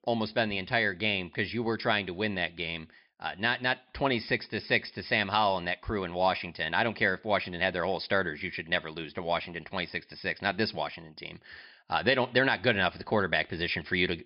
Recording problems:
high frequencies cut off; noticeable; nothing above 5.5 kHz

